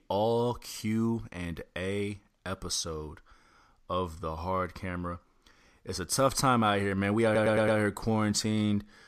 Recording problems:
audio stuttering; at 7.5 s

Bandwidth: 14.5 kHz